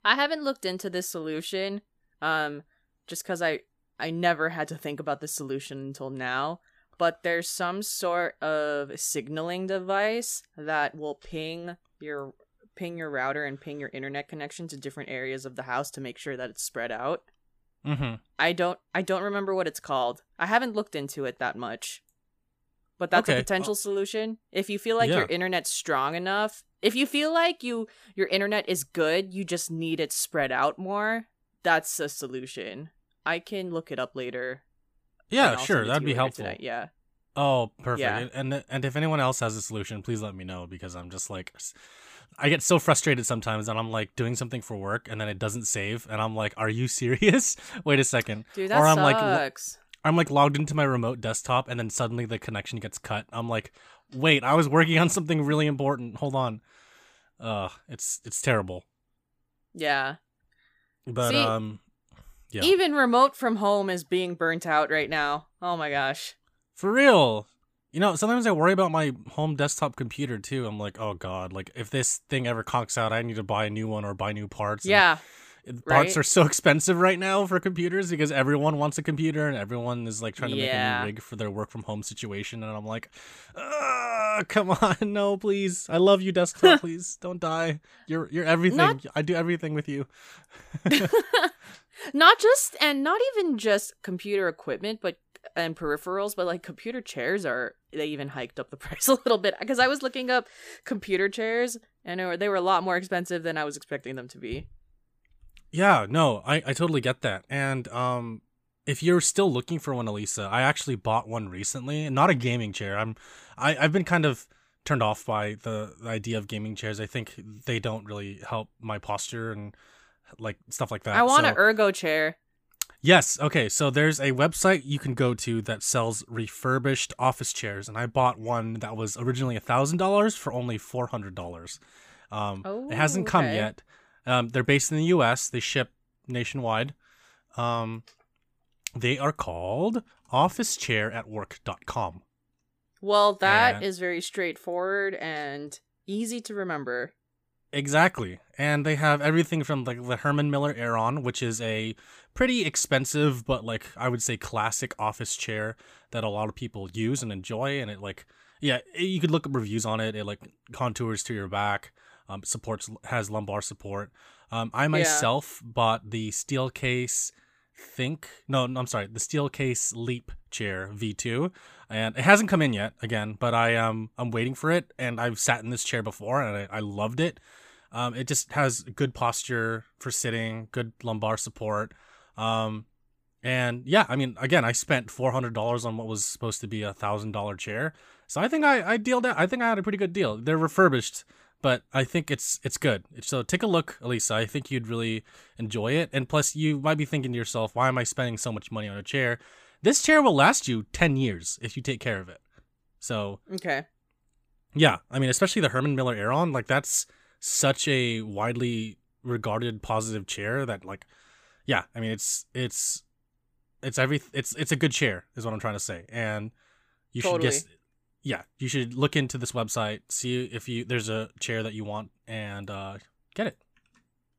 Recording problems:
none

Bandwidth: 15 kHz